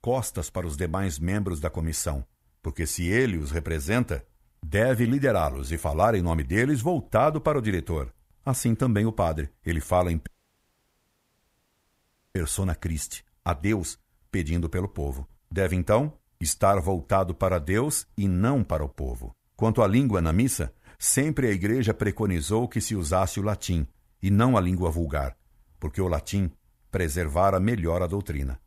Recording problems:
audio cutting out; at 10 s for 2 s

